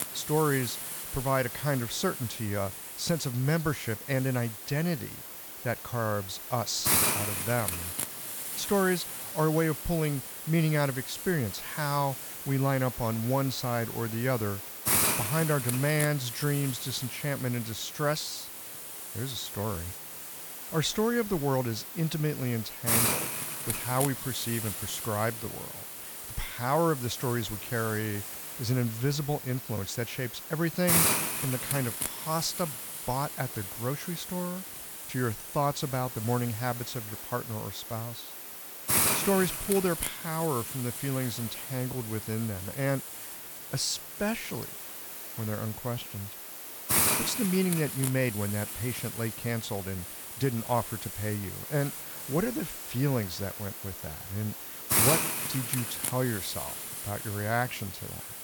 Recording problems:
hiss; loud; throughout; 1 dB below the speech

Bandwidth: 18.5 kHz